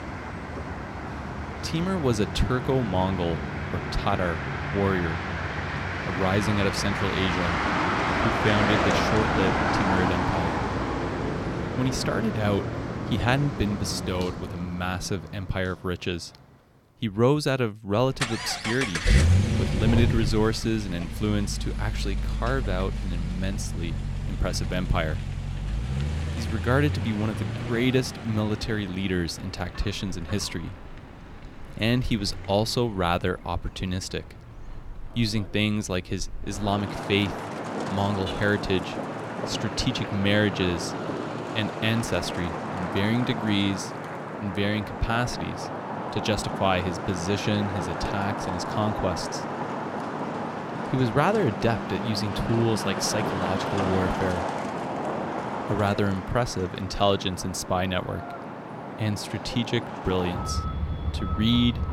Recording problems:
traffic noise; loud; throughout; 3 dB below the speech

